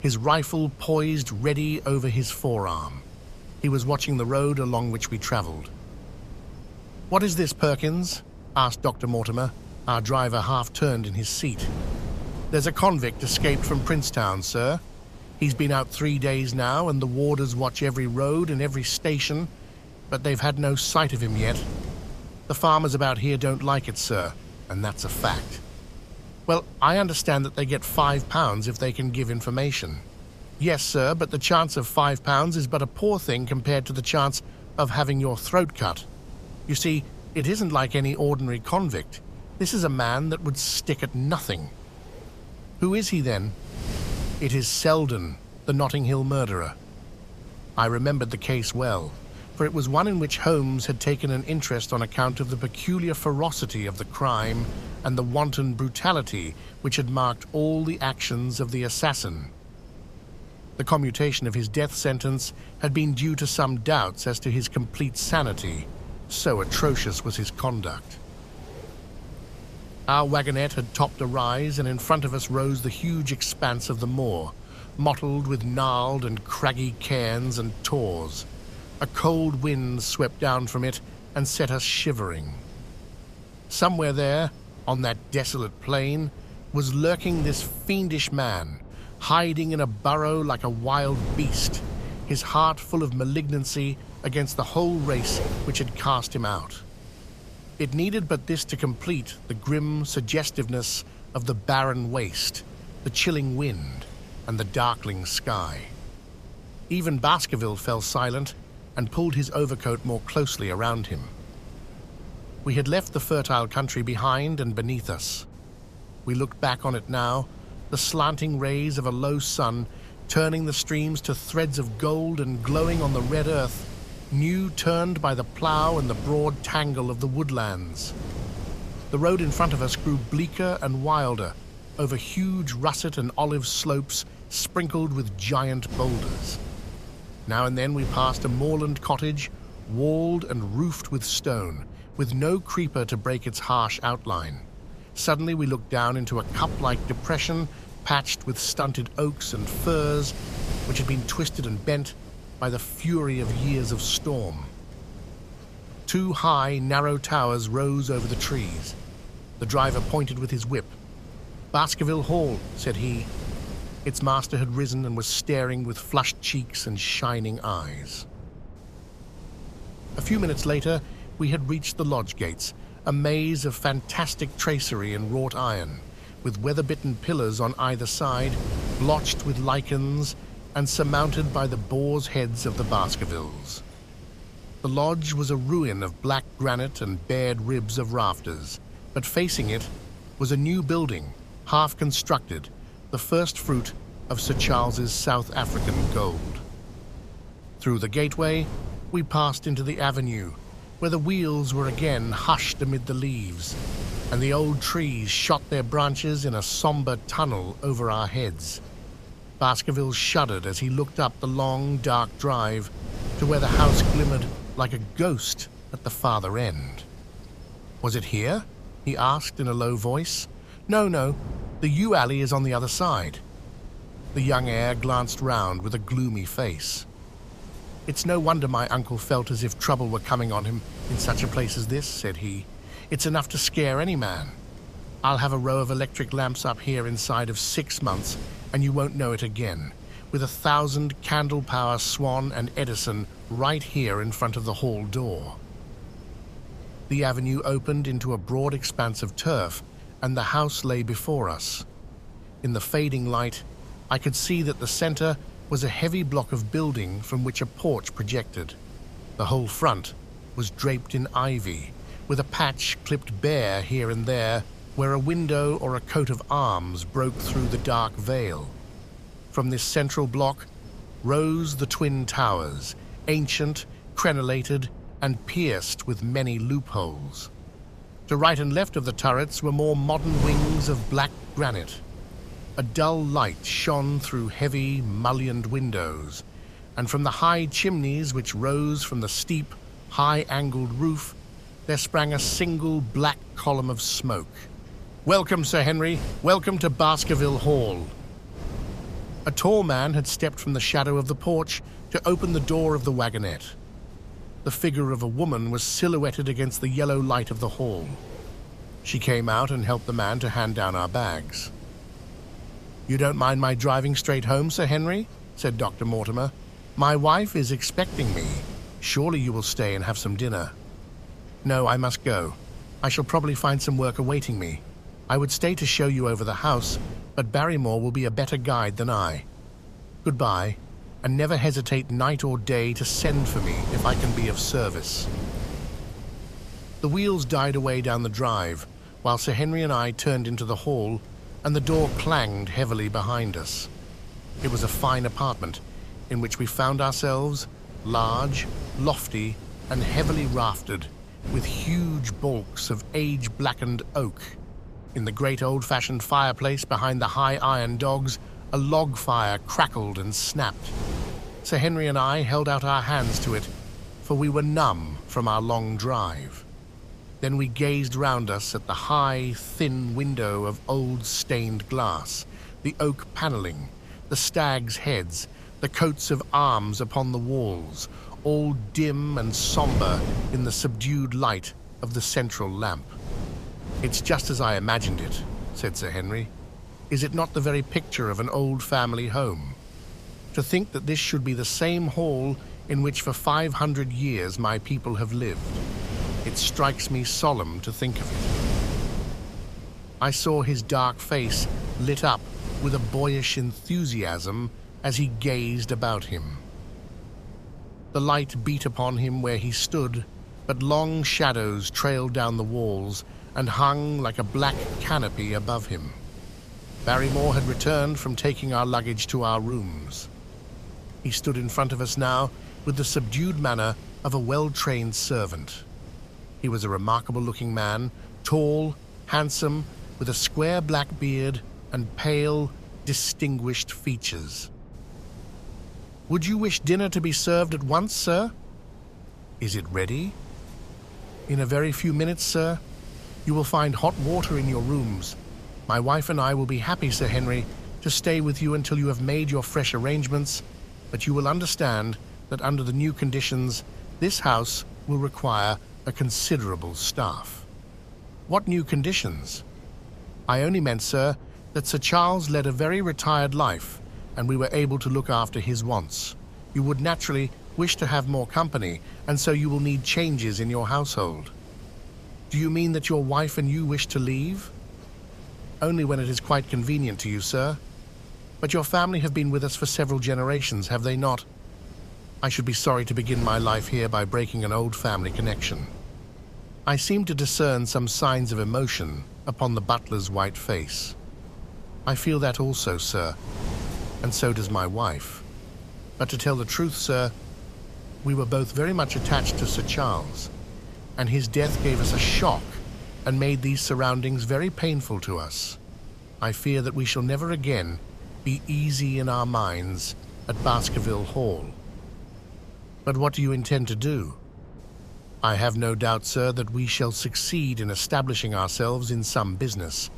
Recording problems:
wind noise on the microphone; occasional gusts; 20 dB below the speech

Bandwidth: 14.5 kHz